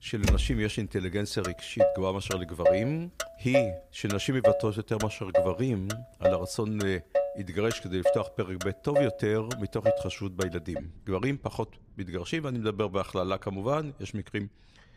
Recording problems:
traffic noise; very loud; throughout; 1 dB above the speech

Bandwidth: 15 kHz